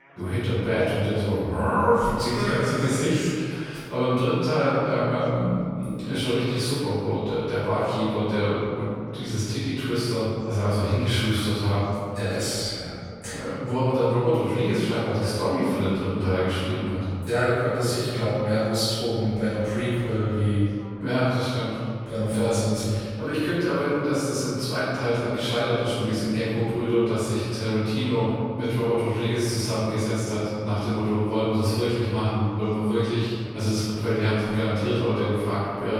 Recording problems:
room echo; strong; dies away in 2 s
off-mic speech; far
background chatter; faint; throughout; 3 voices, 25 dB below the speech

